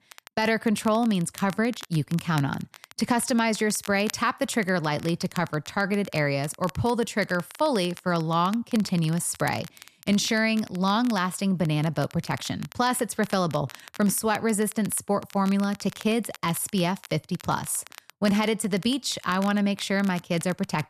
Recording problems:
crackle, like an old record; noticeable; 20 dB below the speech

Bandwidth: 14 kHz